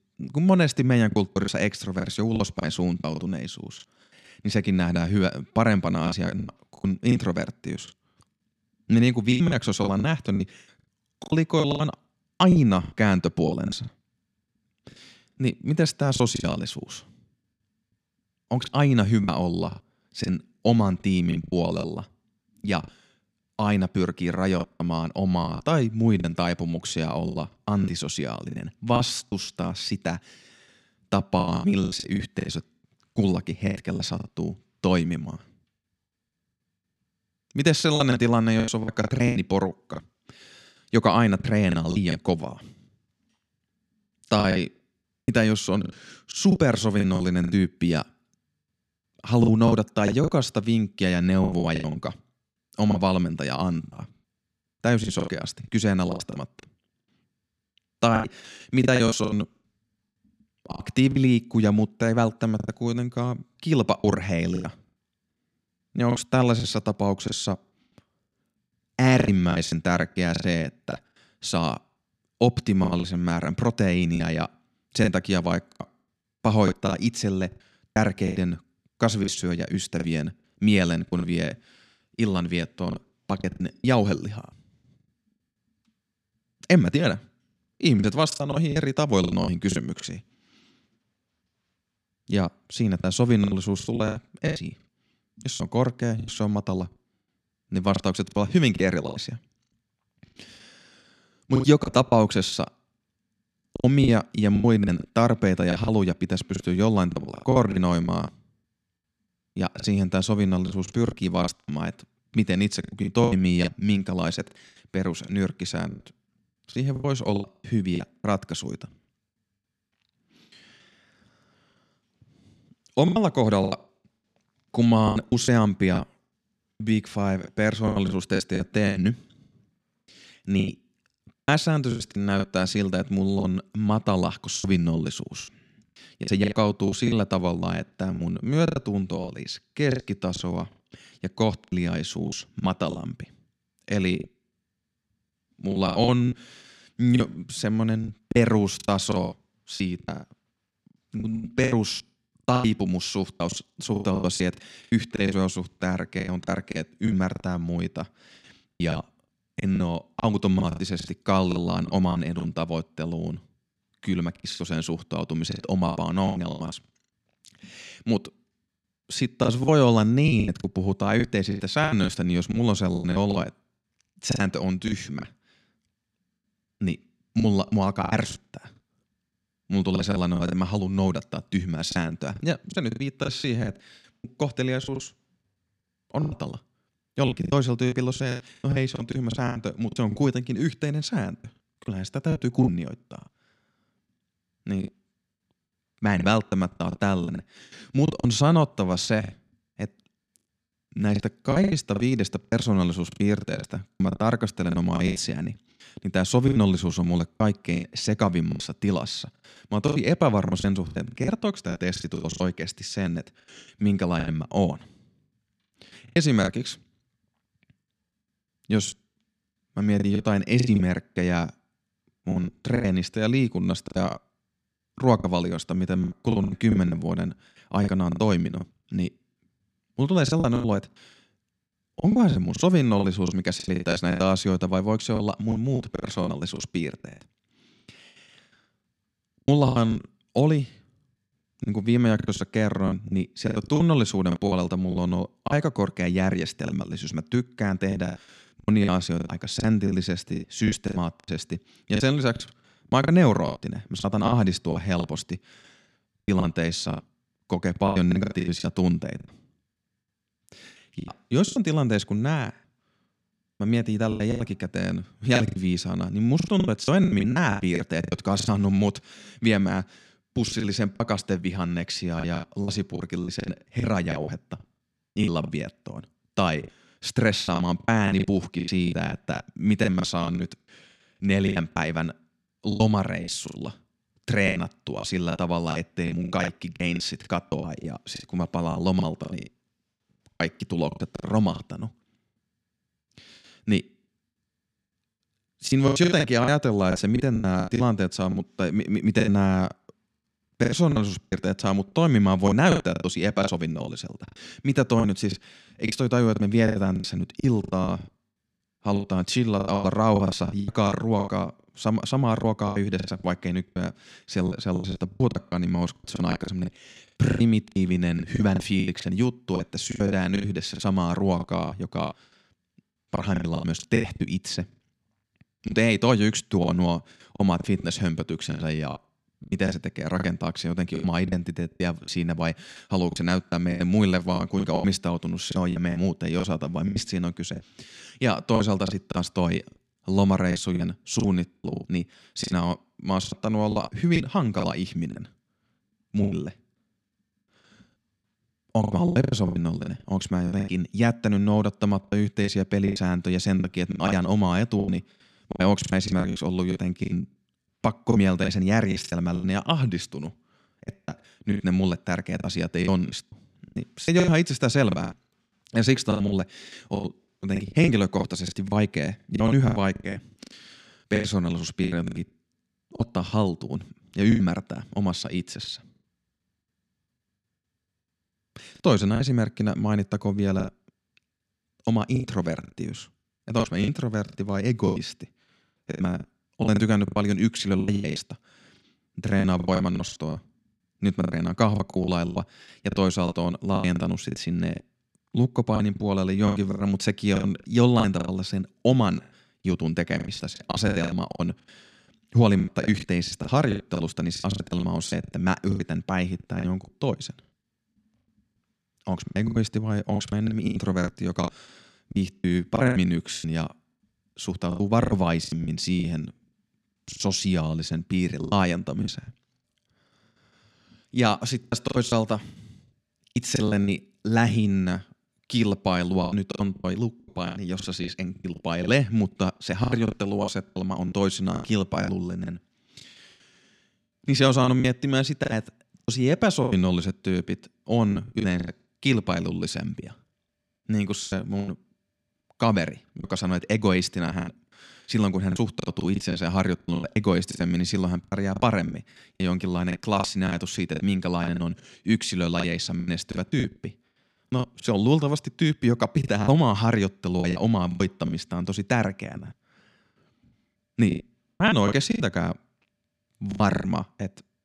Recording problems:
choppy; very; 14% of the speech affected

